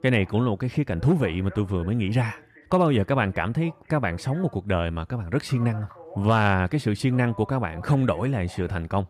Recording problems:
voice in the background; faint; throughout; 20 dB below the speech

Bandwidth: 14.5 kHz